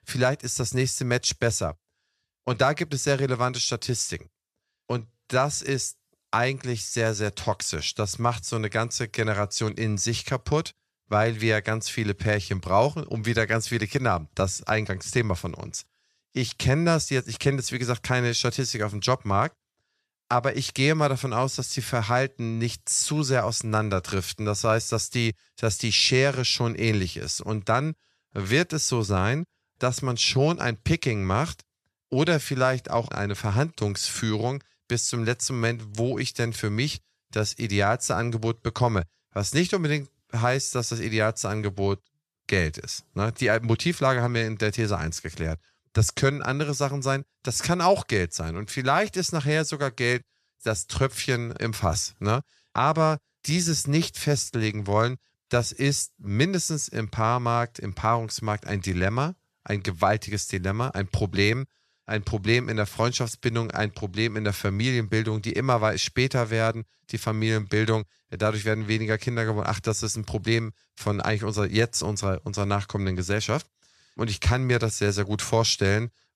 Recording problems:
none

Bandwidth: 14.5 kHz